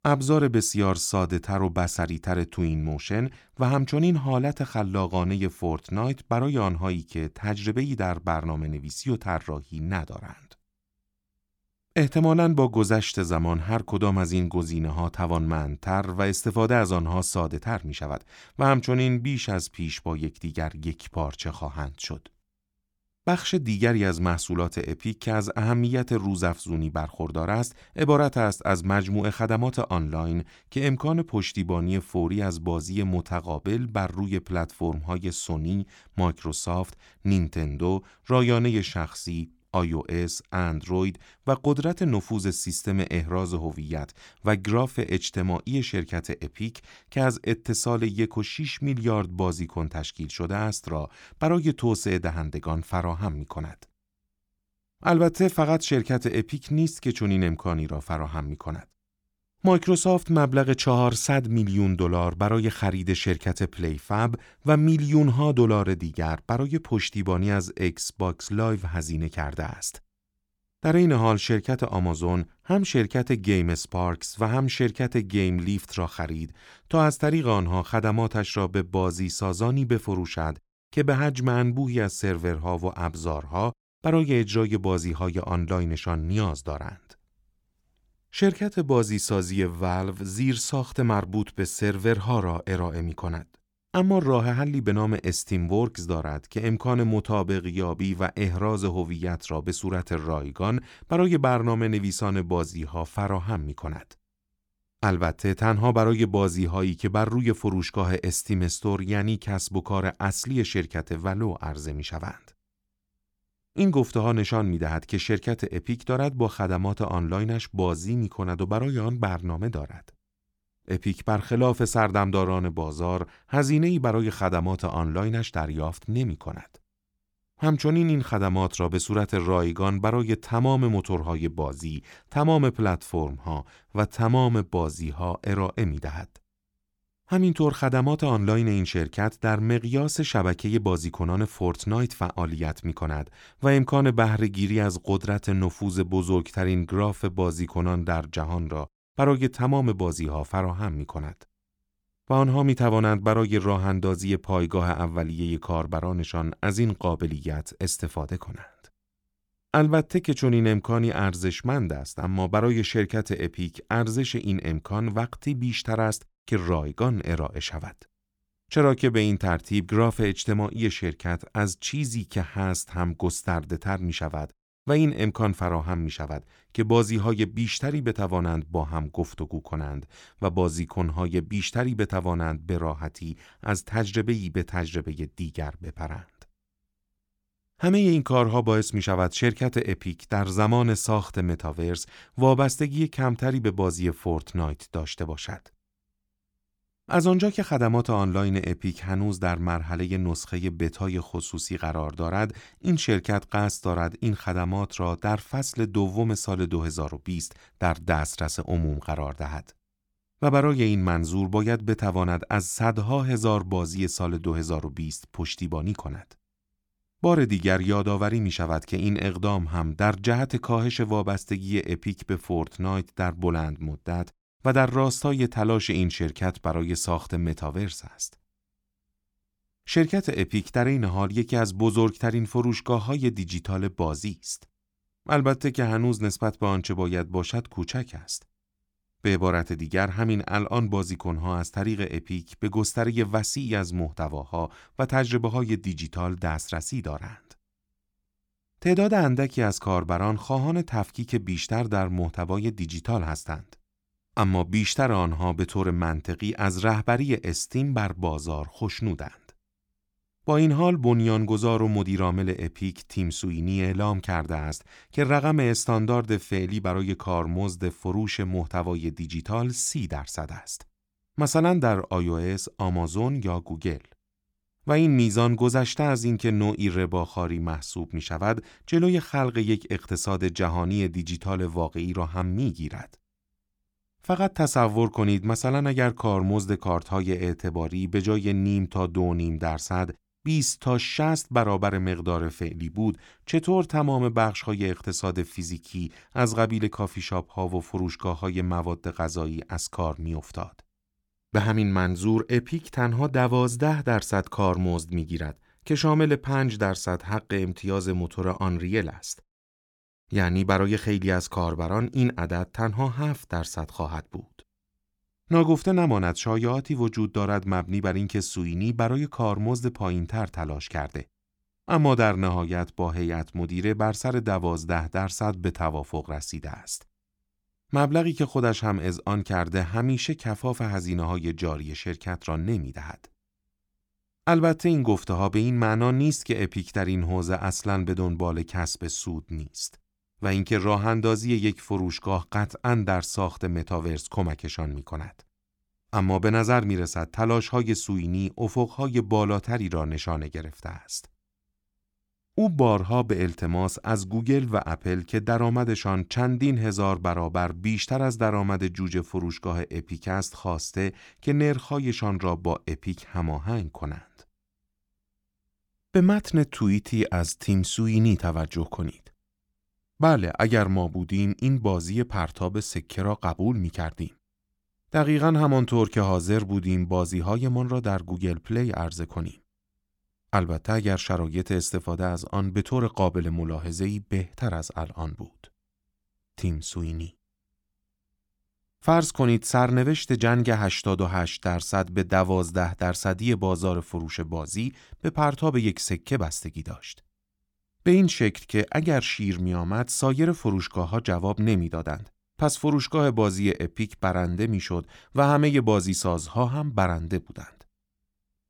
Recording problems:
none

